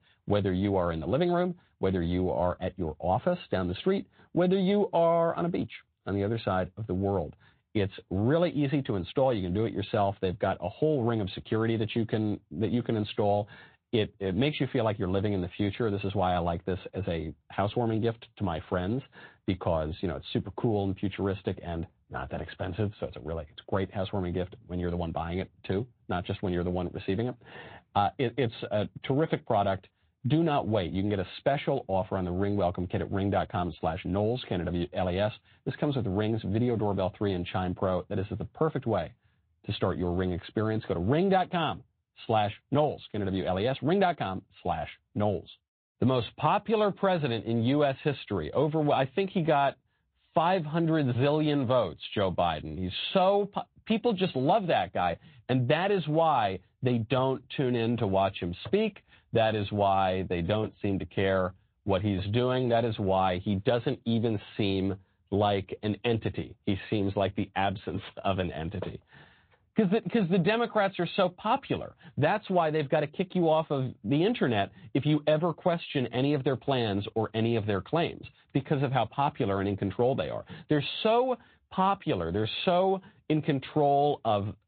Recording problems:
high frequencies cut off; severe; nothing above 4 kHz
garbled, watery; slightly

